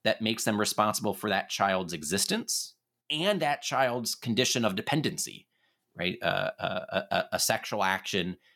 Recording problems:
none

